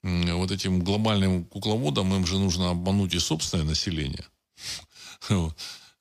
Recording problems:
none

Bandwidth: 15 kHz